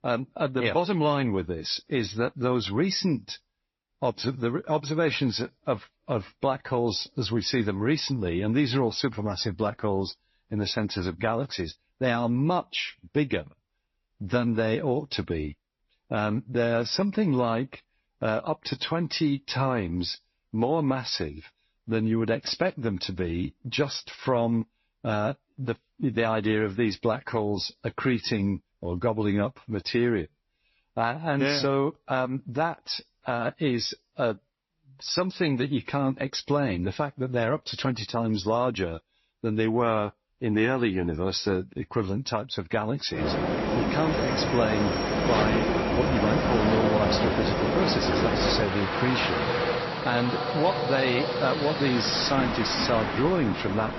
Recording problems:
garbled, watery; slightly; nothing above 5.5 kHz
train or aircraft noise; very loud; from 43 s on; 1 dB above the speech

